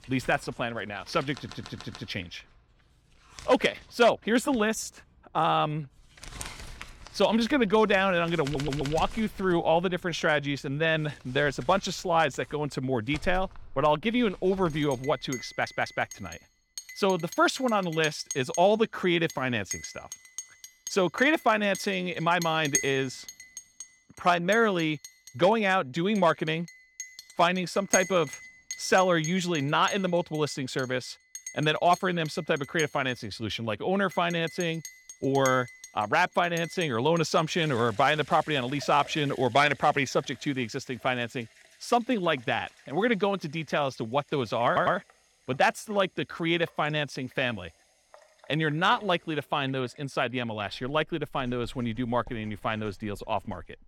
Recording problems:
household noises; noticeable; throughout; 15 dB below the speech
audio stuttering; 4 times, first at 1.5 s

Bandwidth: 17 kHz